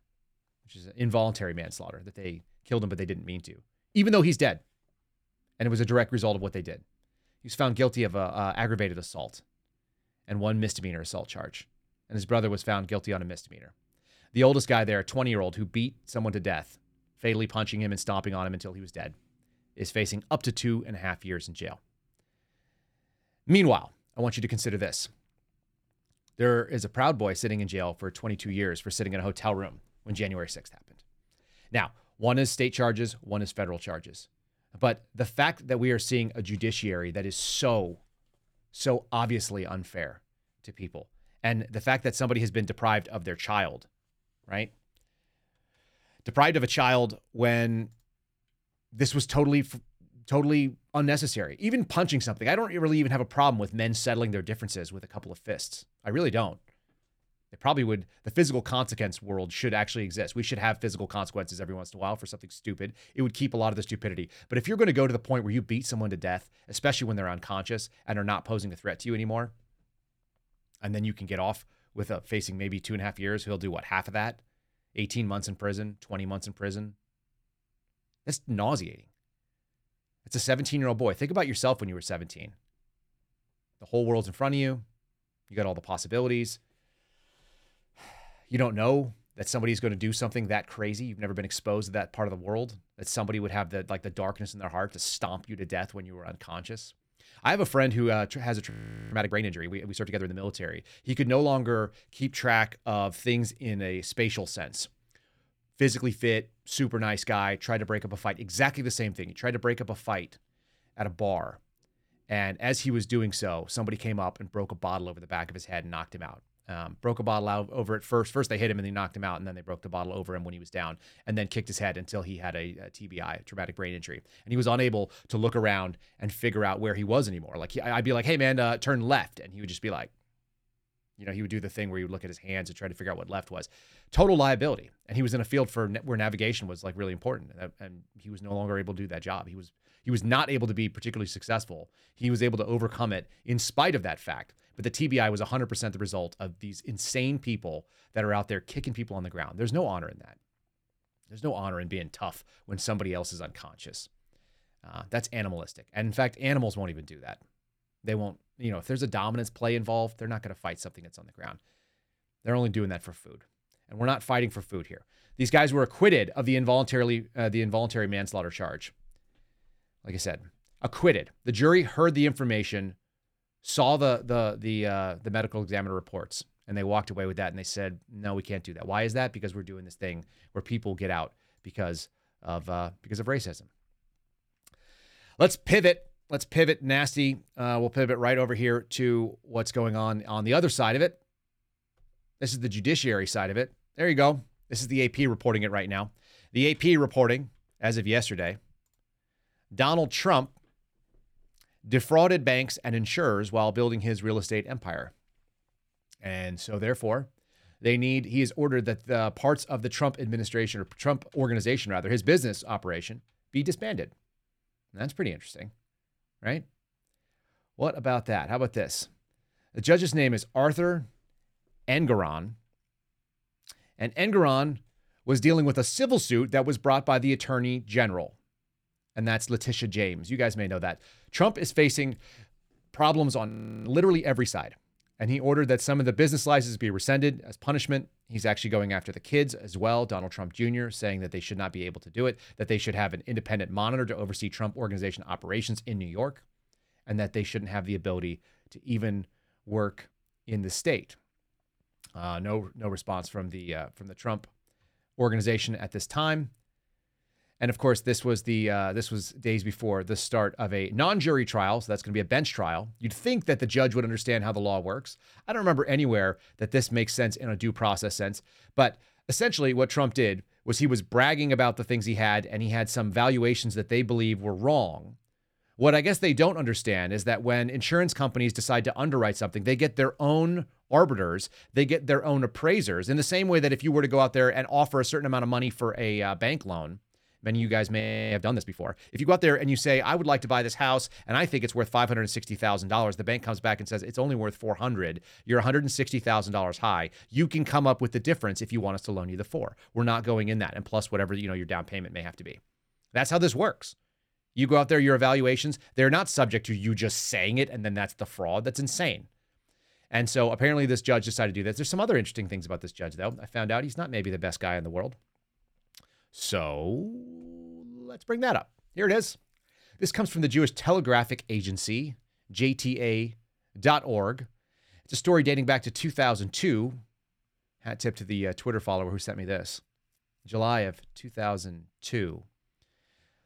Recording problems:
audio freezing; at 1:39, at 3:53 and at 4:48

